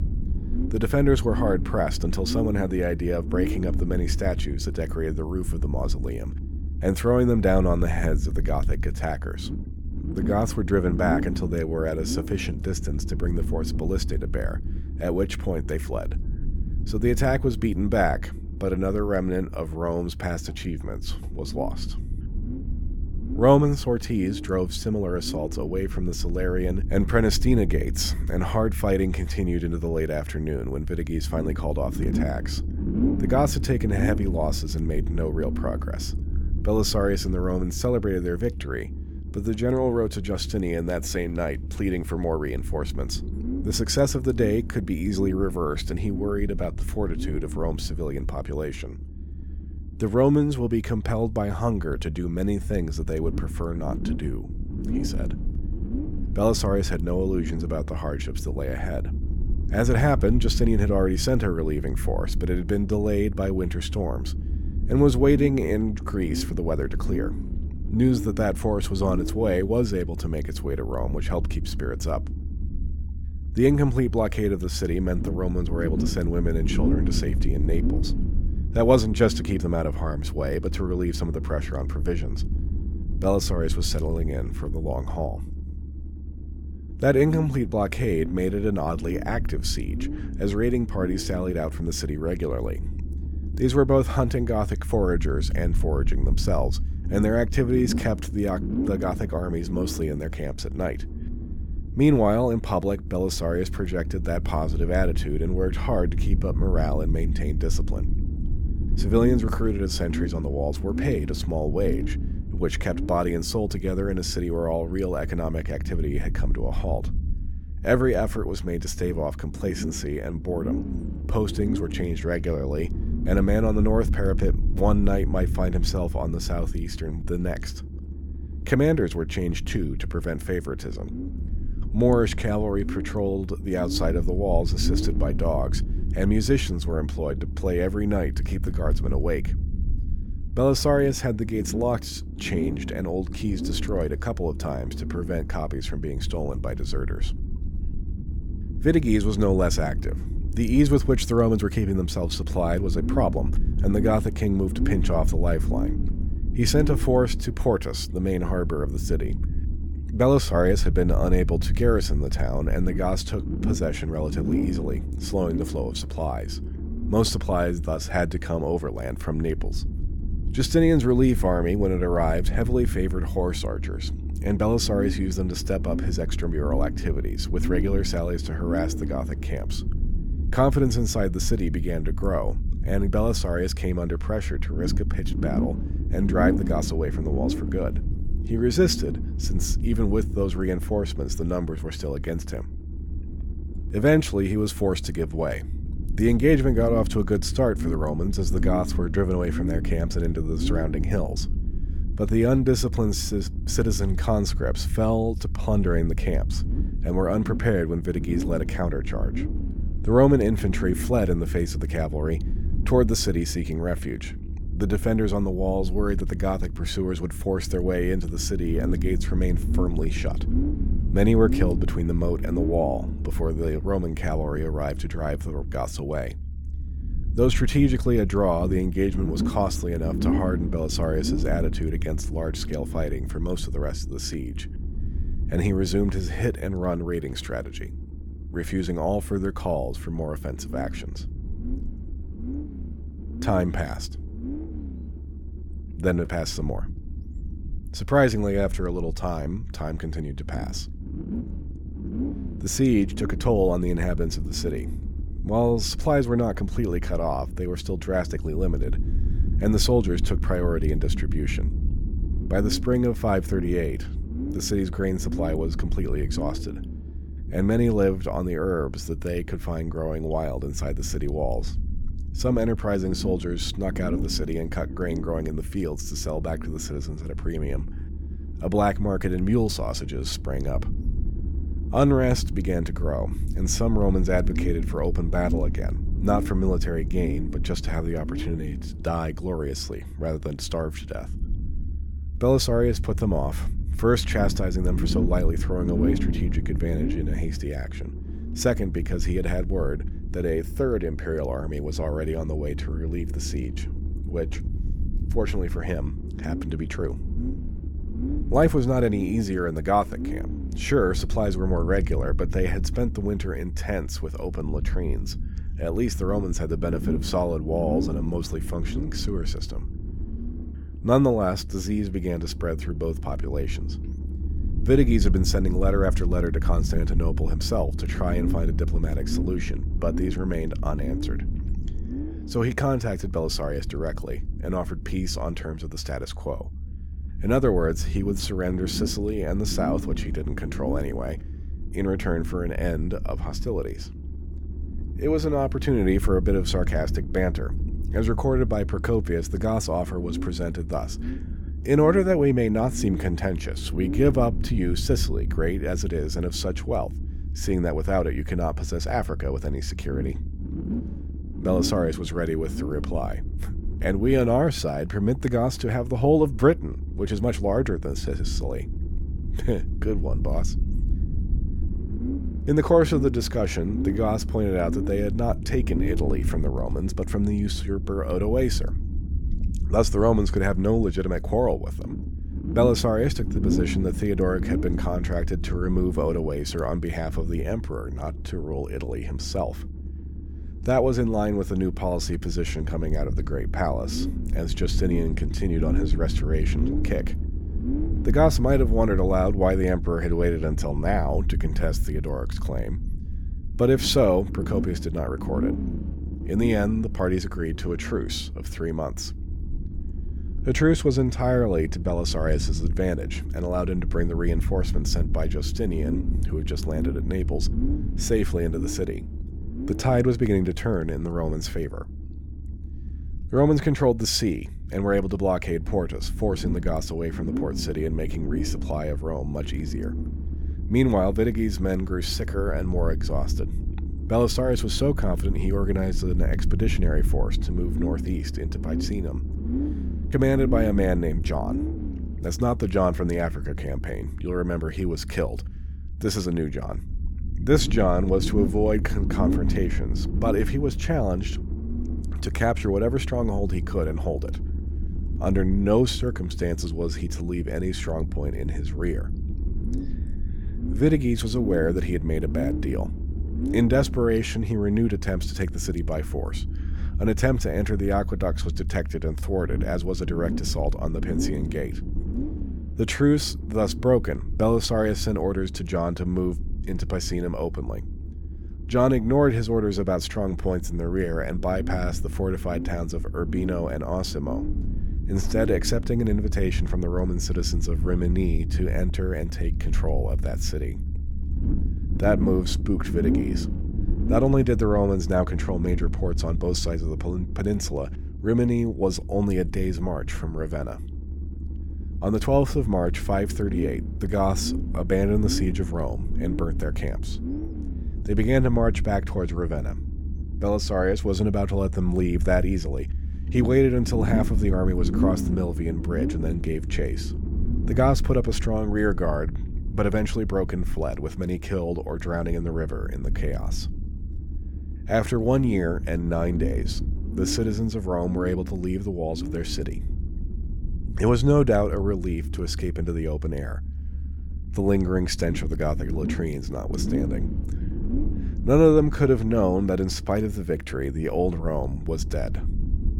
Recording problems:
low rumble; noticeable; throughout; 15 dB below the speech

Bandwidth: 17 kHz